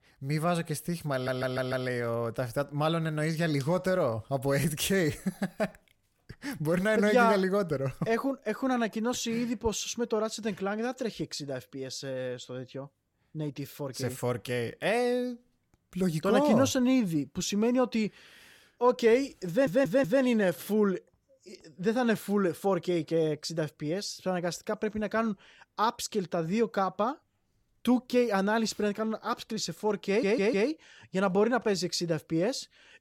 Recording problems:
audio stuttering; at 1 s, at 19 s and at 30 s

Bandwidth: 17 kHz